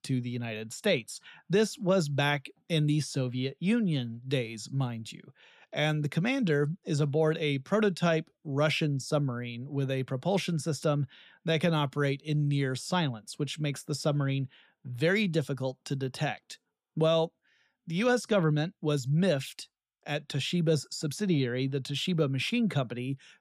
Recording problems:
none

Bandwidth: 15 kHz